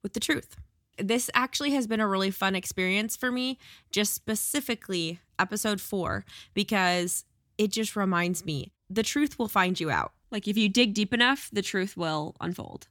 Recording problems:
none

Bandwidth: 18.5 kHz